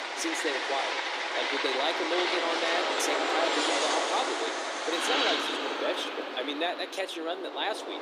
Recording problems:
thin; somewhat; fading below 300 Hz
train or aircraft noise; very loud; throughout; 4 dB above the speech

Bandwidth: 15 kHz